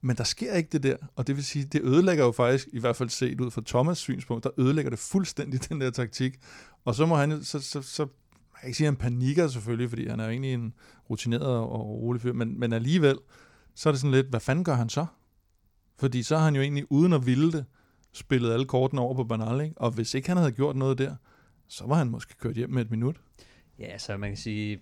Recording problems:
none

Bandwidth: 17.5 kHz